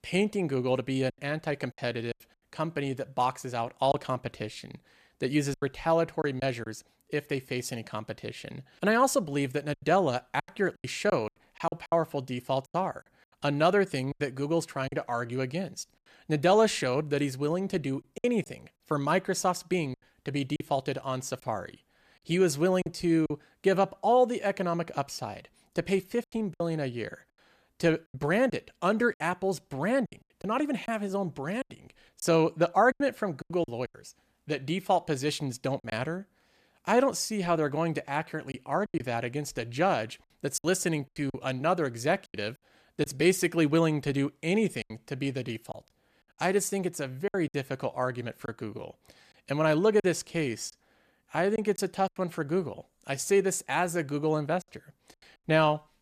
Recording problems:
choppy; very; 7% of the speech affected

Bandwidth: 14.5 kHz